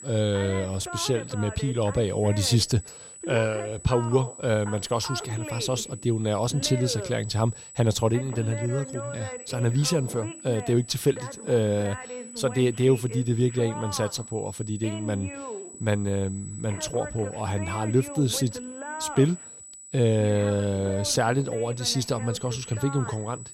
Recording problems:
high-pitched whine; noticeable; throughout; 8 kHz, 15 dB below the speech
voice in the background; noticeable; throughout; 15 dB below the speech

